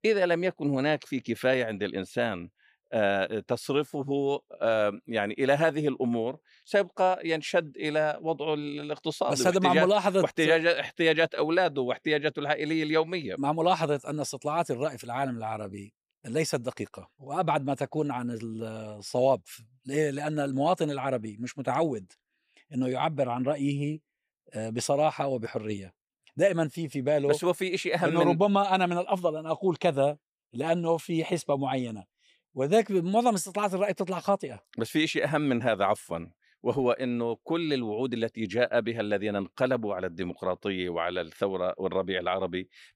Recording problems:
none

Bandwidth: 15 kHz